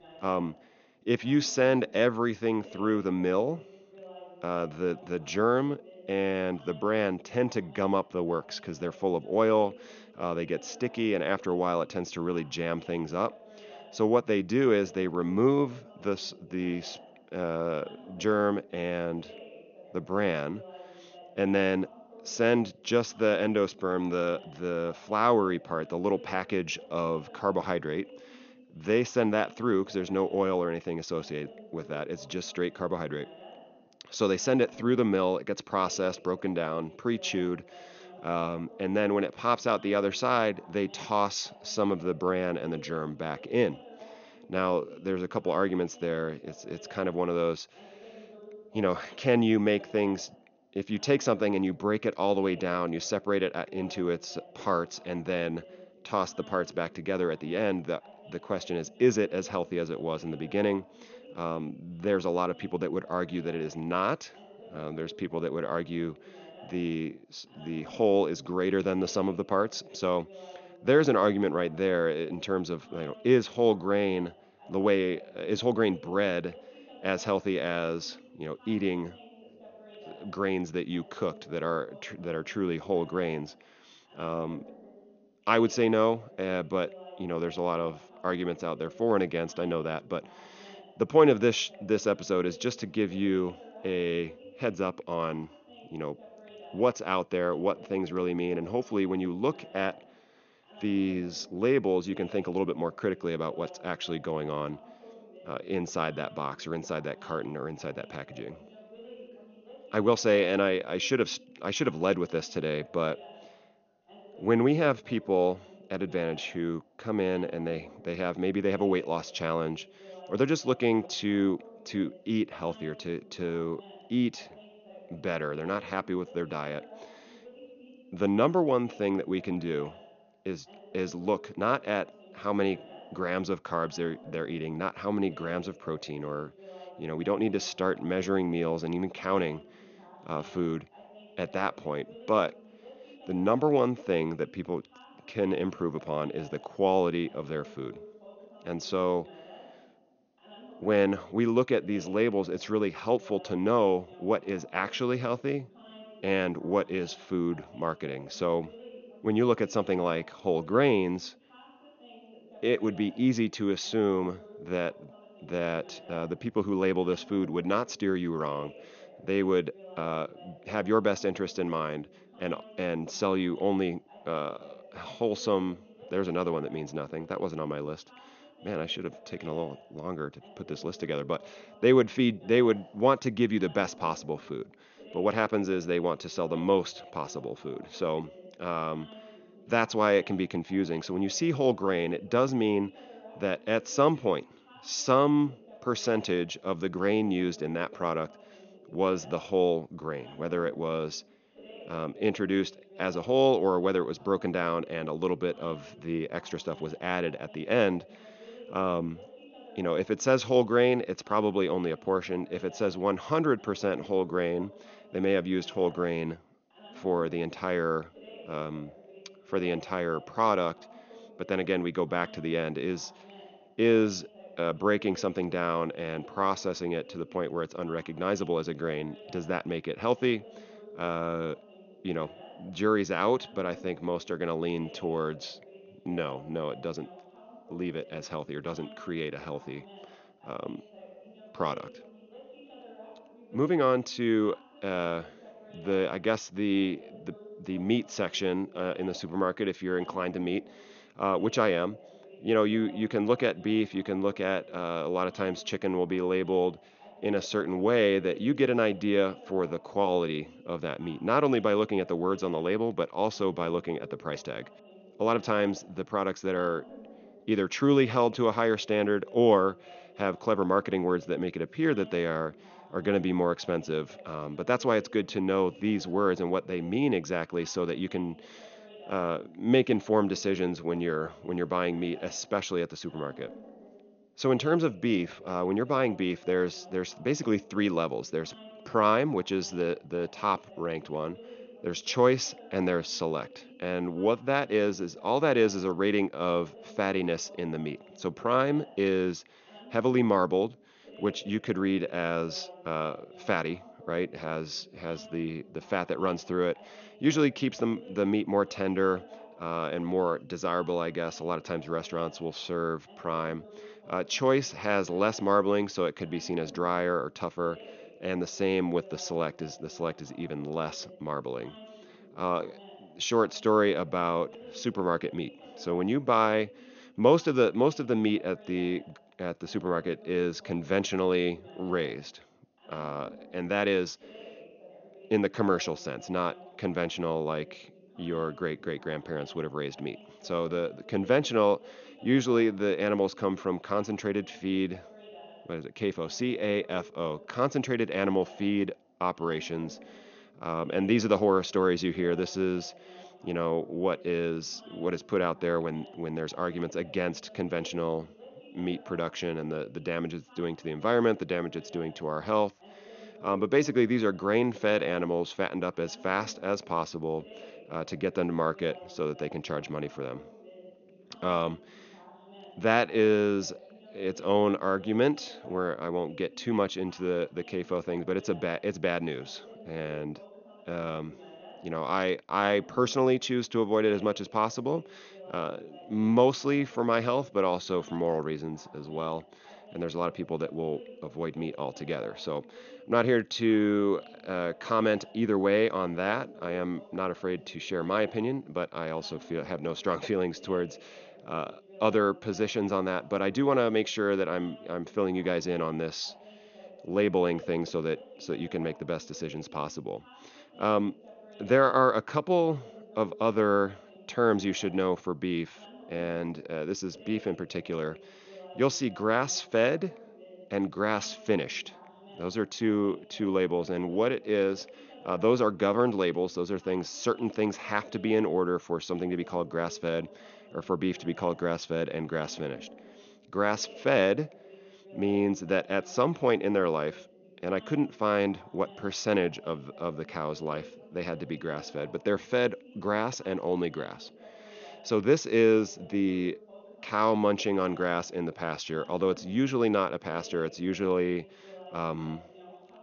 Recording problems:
high frequencies cut off; noticeable; nothing above 6.5 kHz
voice in the background; faint; throughout; 20 dB below the speech

